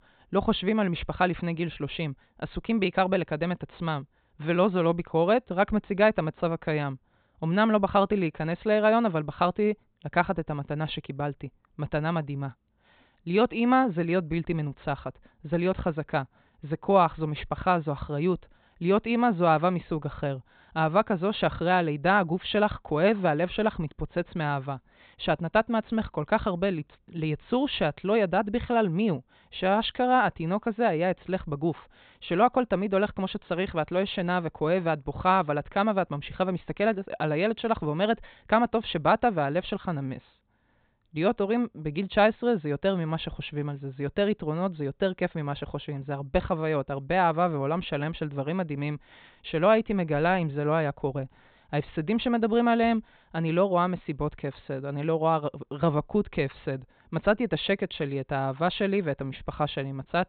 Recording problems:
high frequencies cut off; severe; nothing above 4 kHz

